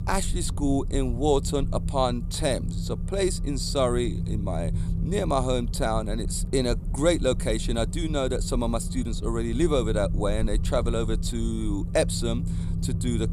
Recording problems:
low rumble; noticeable; throughout; 15 dB below the speech

